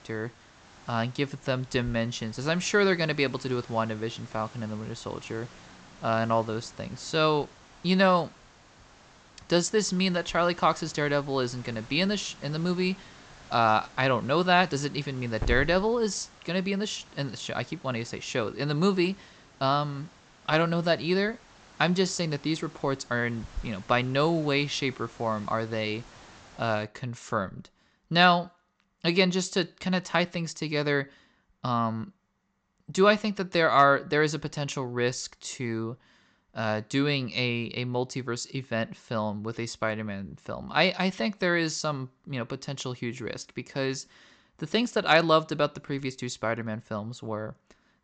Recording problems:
high frequencies cut off; noticeable; nothing above 8 kHz
hiss; faint; until 27 s; 20 dB below the speech

